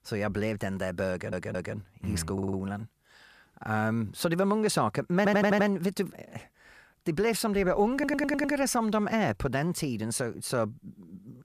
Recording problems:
audio stuttering; 4 times, first at 1 s

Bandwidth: 14.5 kHz